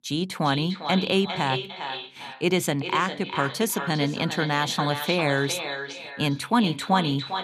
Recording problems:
echo of what is said; strong; throughout; 400 ms later, 7 dB below the speech

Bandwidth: 13.5 kHz